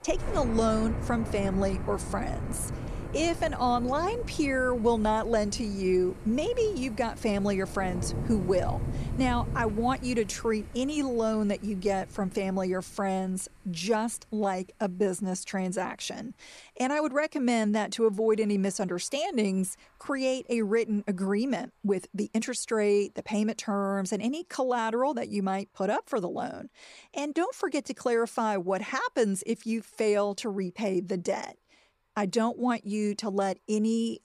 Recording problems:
rain or running water; loud; throughout; 9 dB below the speech

